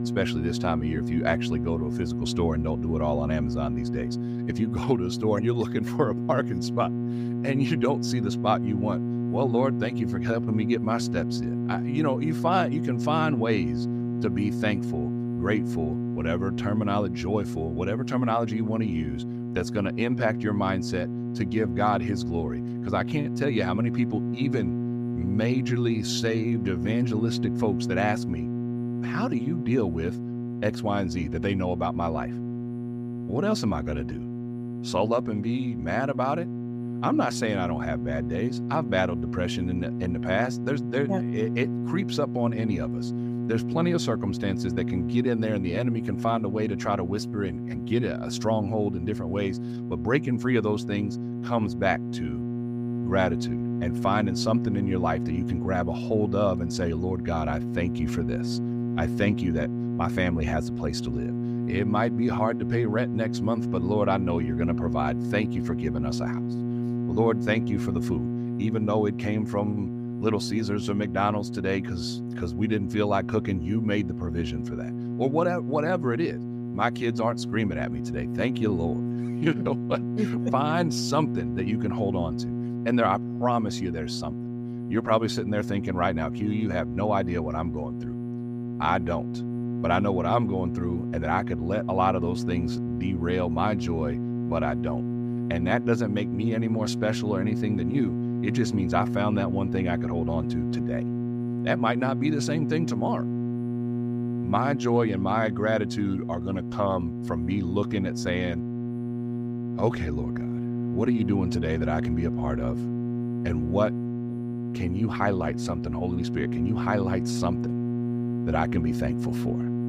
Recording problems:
electrical hum; loud; throughout; 60 Hz, 7 dB below the speech

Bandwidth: 15.5 kHz